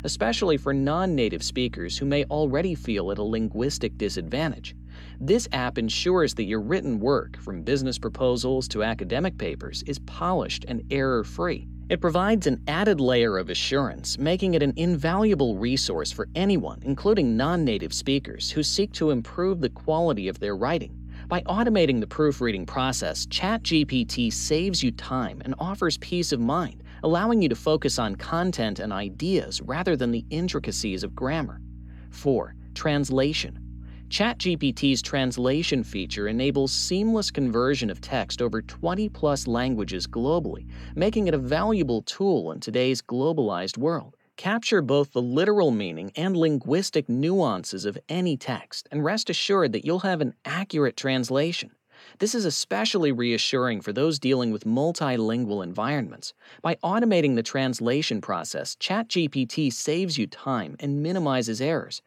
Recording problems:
electrical hum; faint; until 42 s; 60 Hz, 30 dB below the speech

